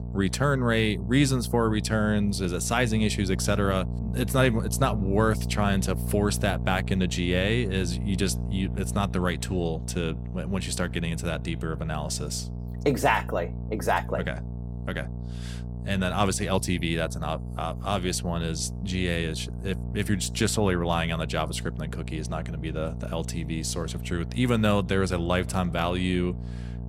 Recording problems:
electrical hum; noticeable; throughout; 60 Hz, 15 dB below the speech

